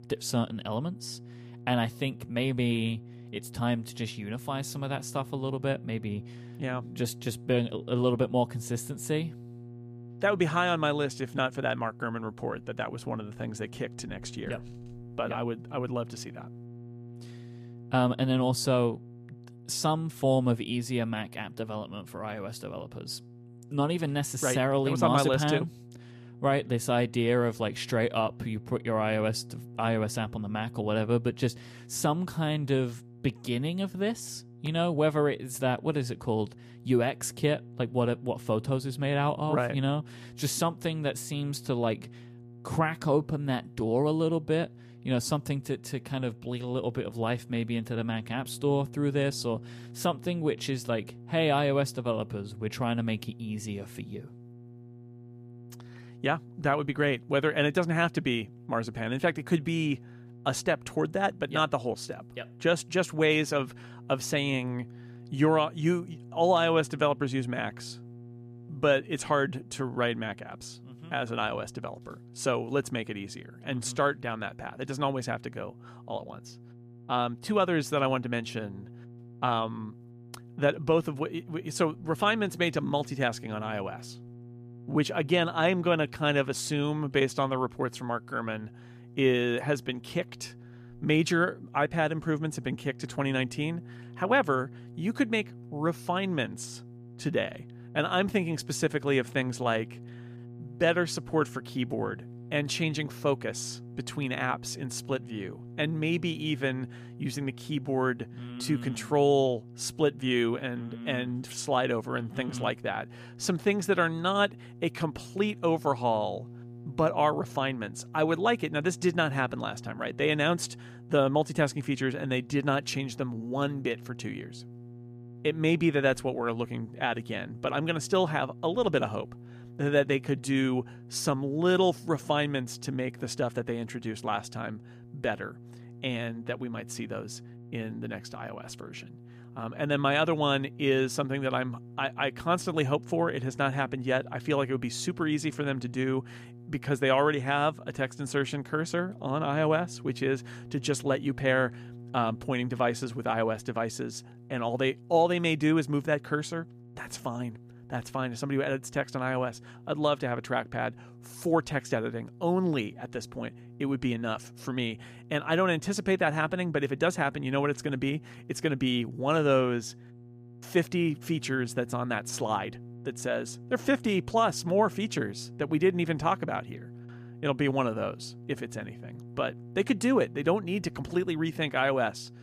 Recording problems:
electrical hum; faint; throughout; 60 Hz, 25 dB below the speech

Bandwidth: 14.5 kHz